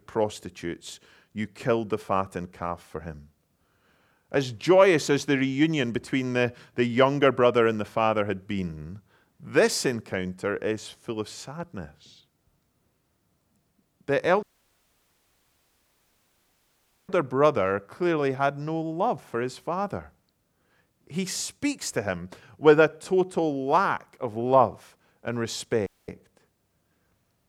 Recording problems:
audio cutting out; at 14 s for 2.5 s and at 26 s

